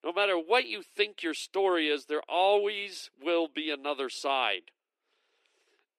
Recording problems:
thin; very; fading below 300 Hz

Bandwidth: 14 kHz